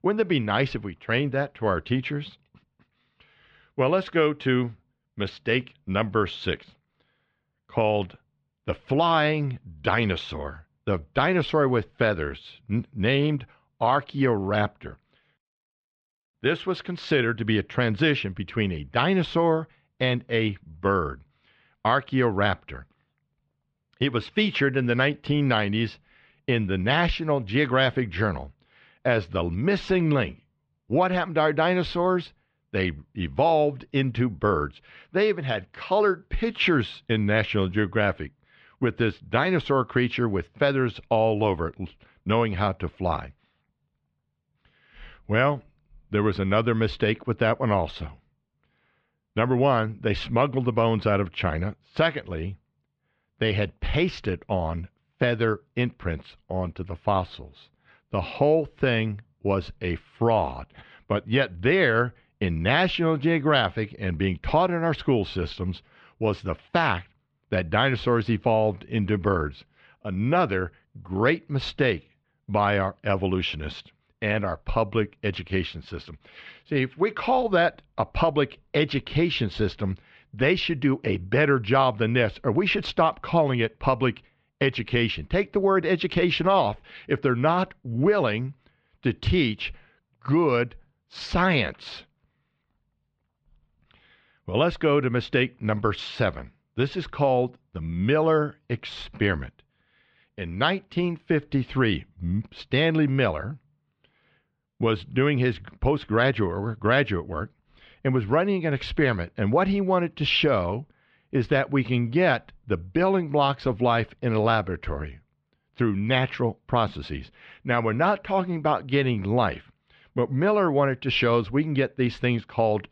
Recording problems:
muffled; slightly; fading above 3.5 kHz

